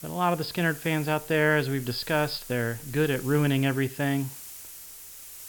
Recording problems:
high frequencies cut off; noticeable; nothing above 5.5 kHz
hiss; noticeable; throughout; 15 dB below the speech

